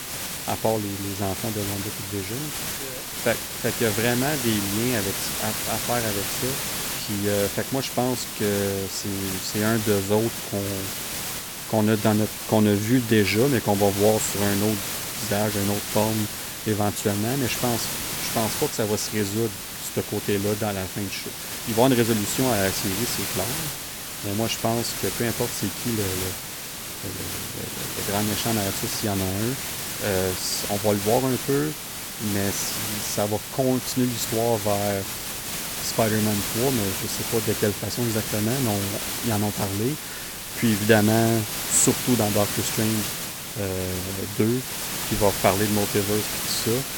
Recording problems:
hiss; loud; throughout; 3 dB below the speech

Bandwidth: 18 kHz